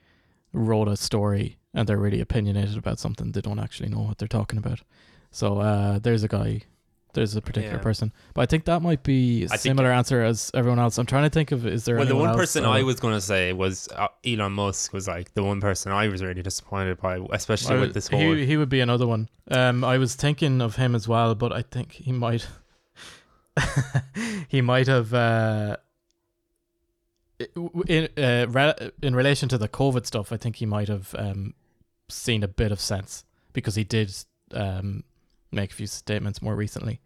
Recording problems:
none

